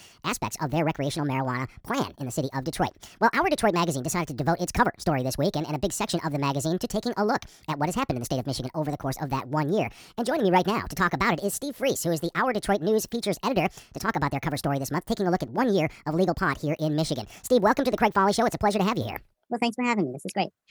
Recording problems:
wrong speed and pitch; too fast and too high; 1.5 times normal speed

